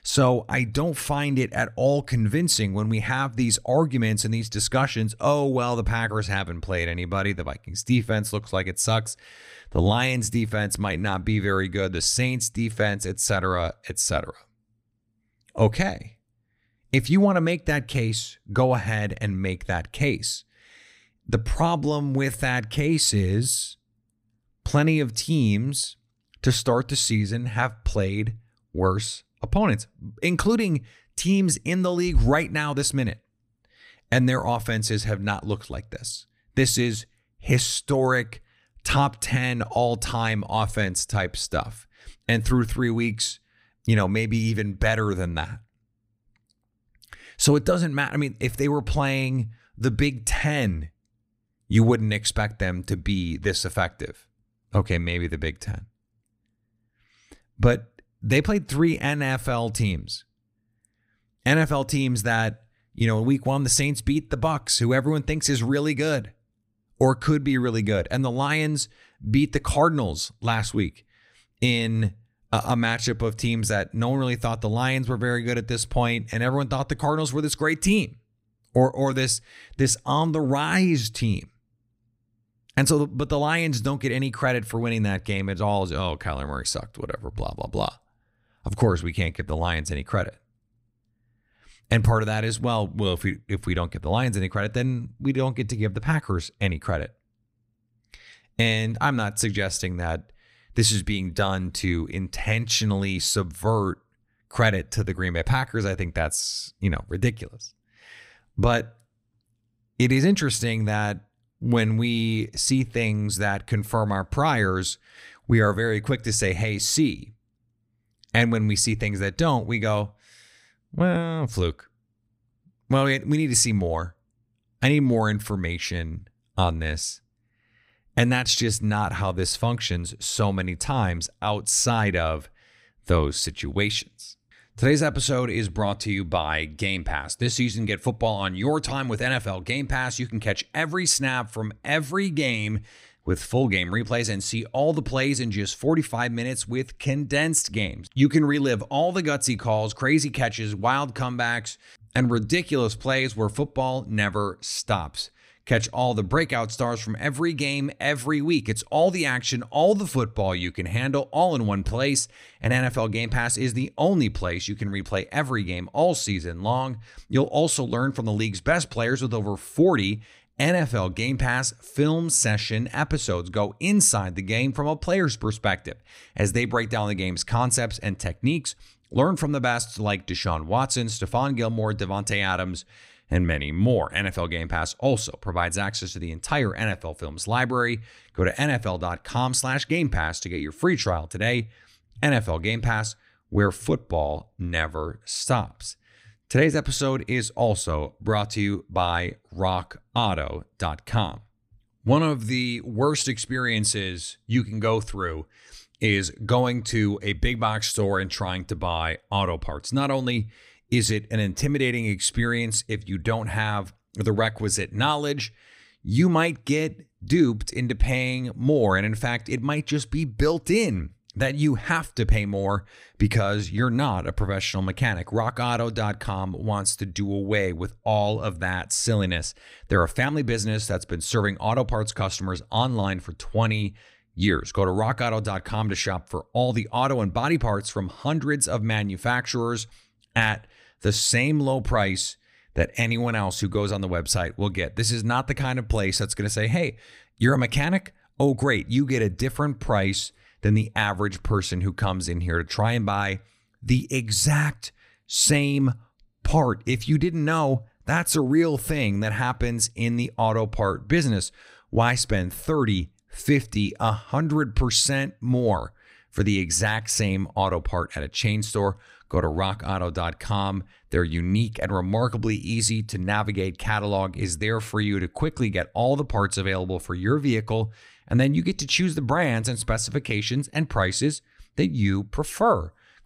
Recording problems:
none

